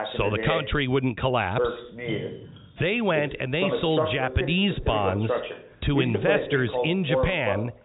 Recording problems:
high frequencies cut off; severe; nothing above 4 kHz
voice in the background; loud; throughout; 4 dB below the speech
rain or running water; noticeable; throughout; 20 dB below the speech

